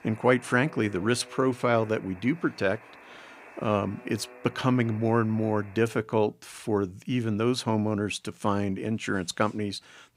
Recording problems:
alarms or sirens; faint; until 6 s; 20 dB below the speech

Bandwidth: 15.5 kHz